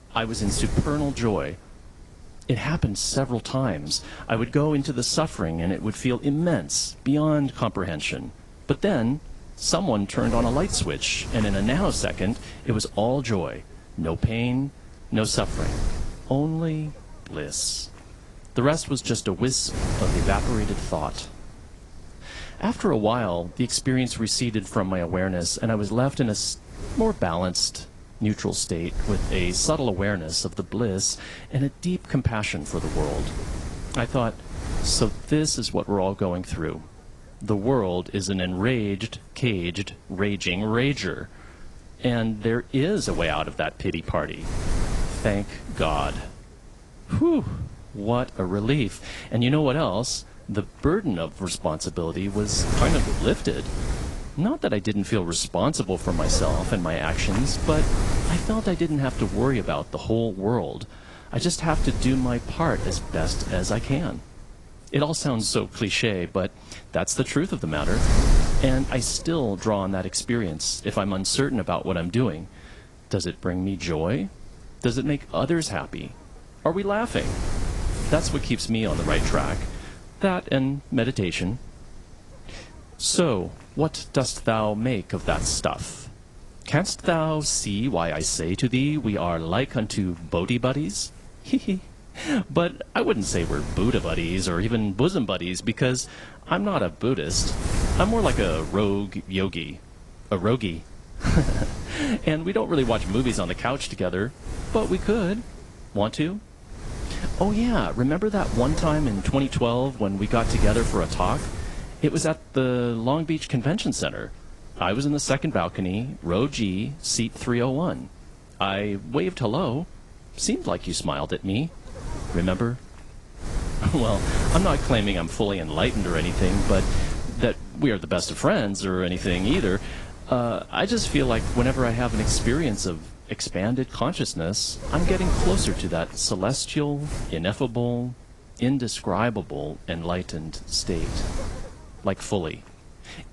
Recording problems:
garbled, watery; slightly; nothing above 10.5 kHz
wind noise on the microphone; heavy; 10 dB below the speech

